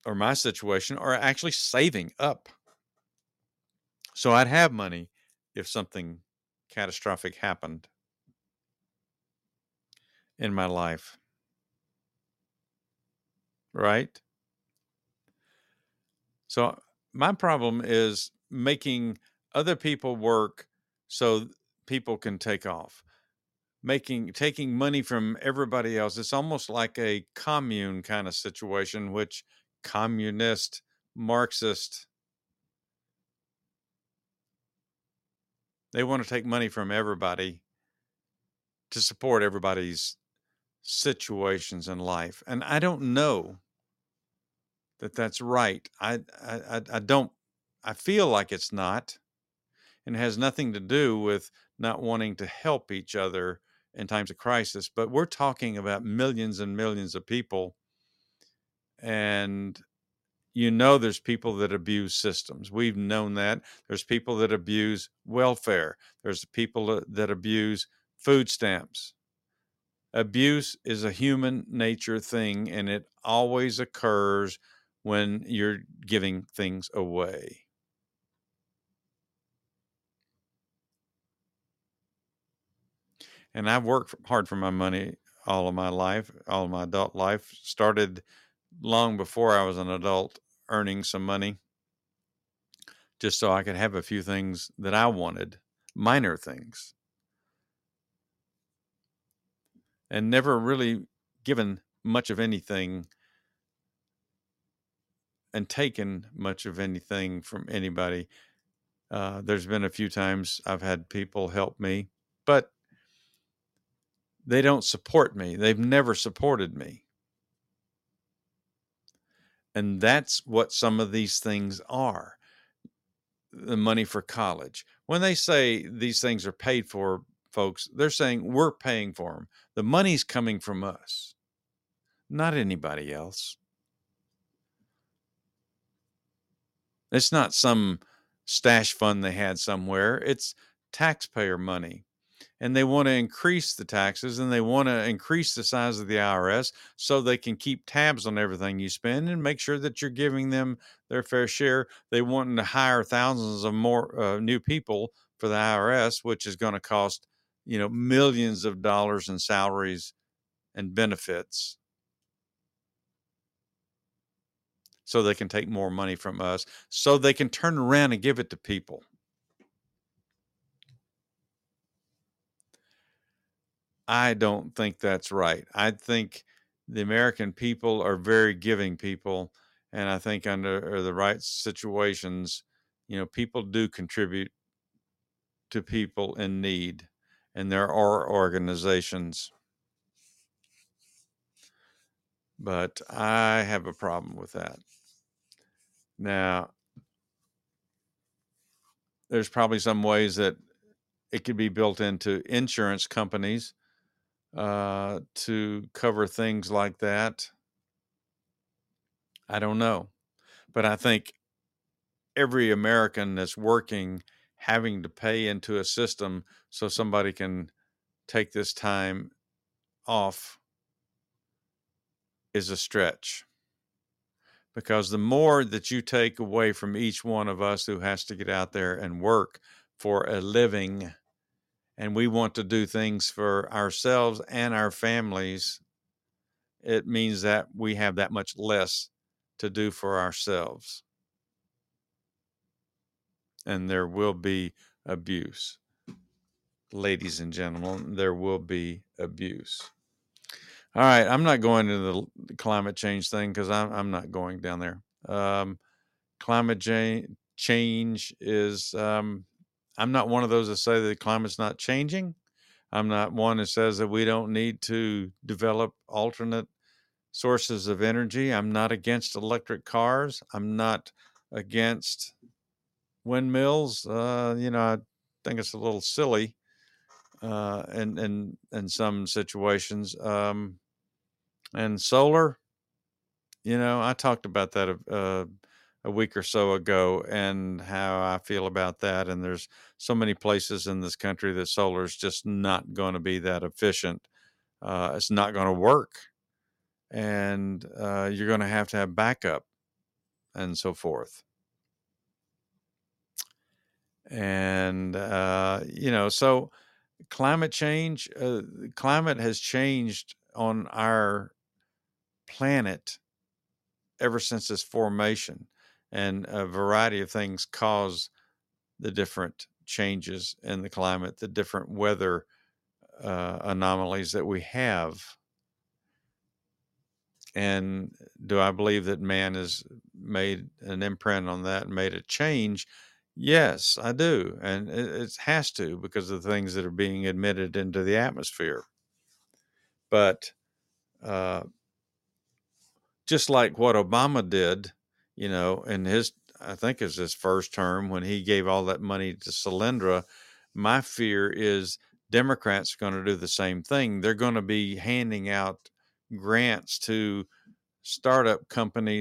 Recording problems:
uneven, jittery; strongly; from 1.5 s to 5:34
abrupt cut into speech; at the end

